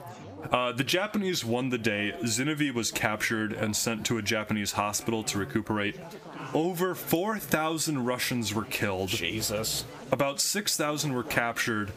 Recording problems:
squashed, flat; somewhat, background pumping
chatter from many people; noticeable; throughout; 20 dB below the speech

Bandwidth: 15 kHz